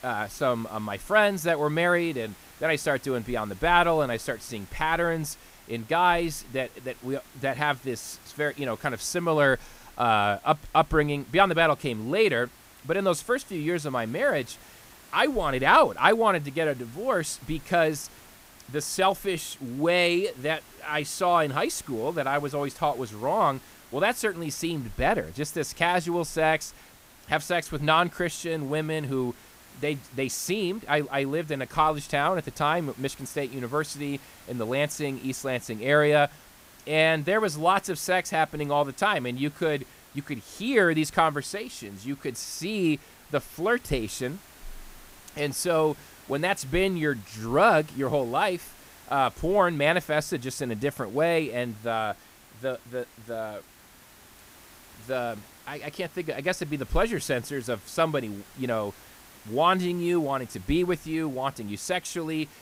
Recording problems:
hiss; faint; throughout; 25 dB below the speech

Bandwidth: 15.5 kHz